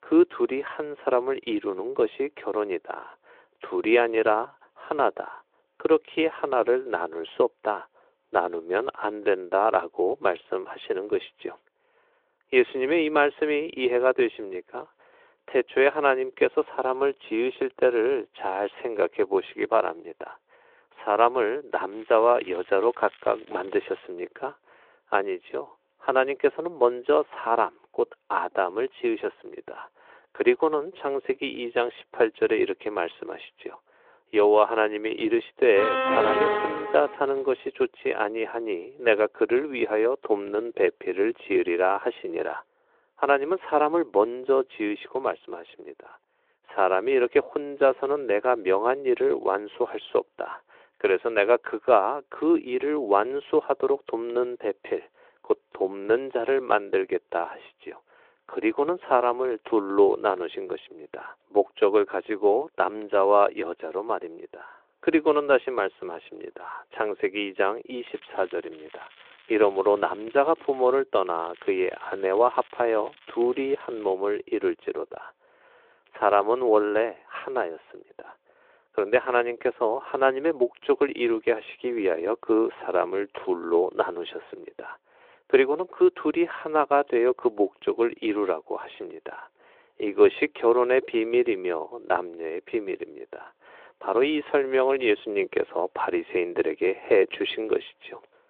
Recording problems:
phone-call audio; nothing above 3.5 kHz
crackling; faint; from 22 to 24 s, from 1:08 to 1:11 and from 1:11 to 1:14; 25 dB below the speech
alarm; loud; from 36 to 37 s; peak 3 dB above the speech

